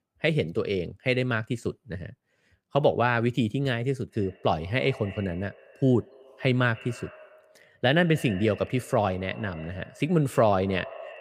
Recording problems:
echo of what is said; faint; from 4 s on; 140 ms later, 20 dB below the speech

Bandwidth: 15 kHz